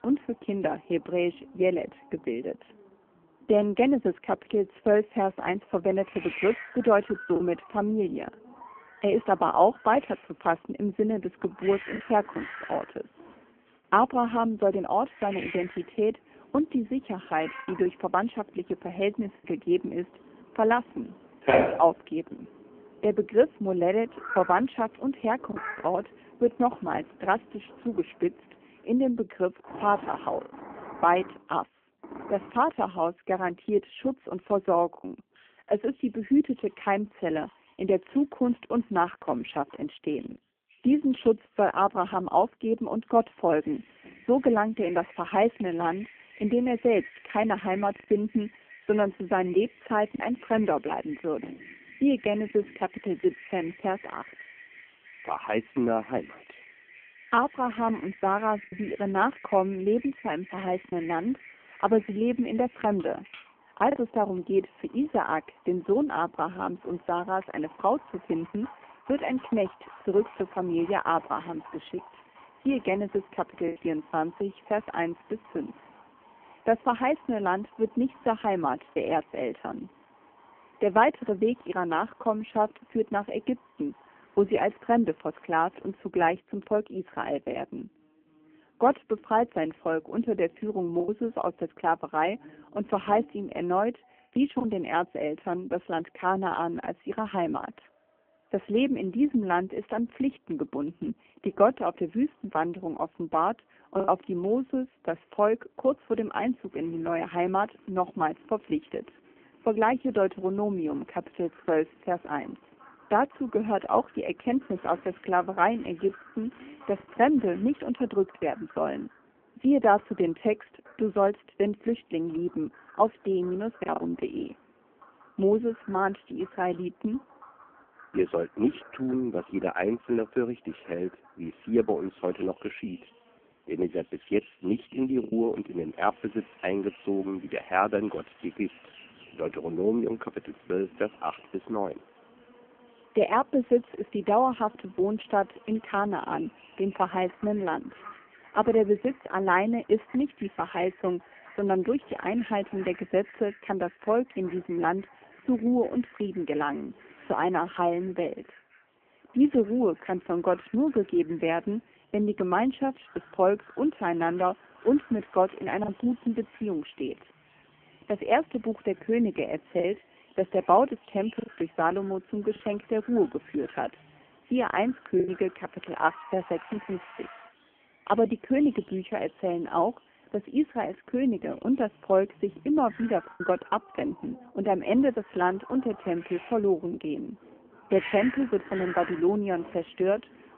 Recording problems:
phone-call audio; poor line
animal sounds; noticeable; throughout; 15 dB below the speech
traffic noise; faint; from 1:30 on; 30 dB below the speech
choppy; occasionally; 1% of the speech affected

